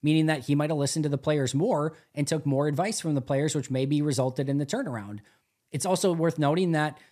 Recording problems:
none

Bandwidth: 14.5 kHz